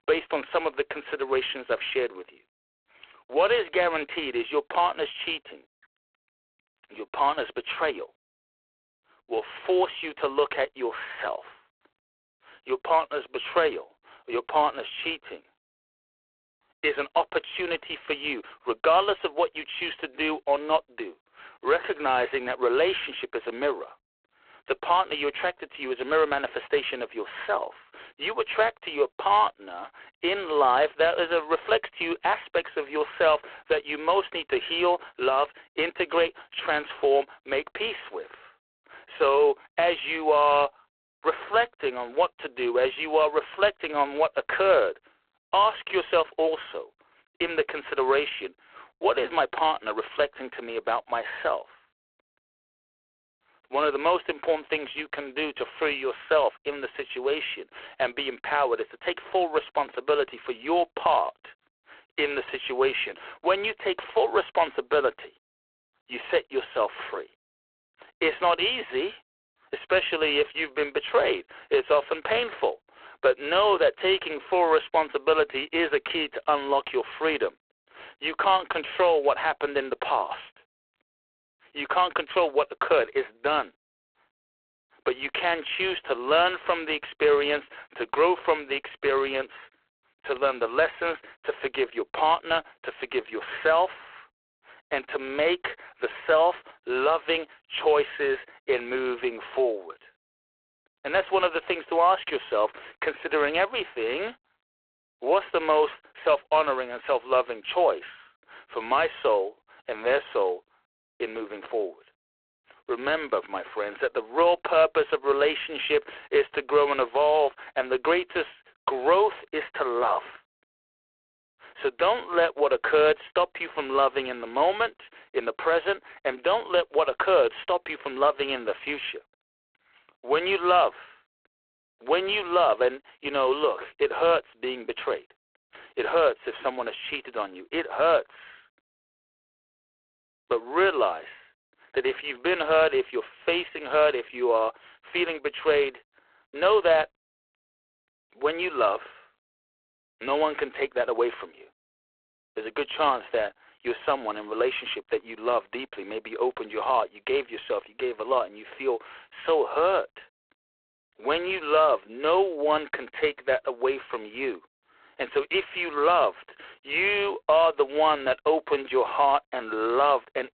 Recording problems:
phone-call audio; poor line

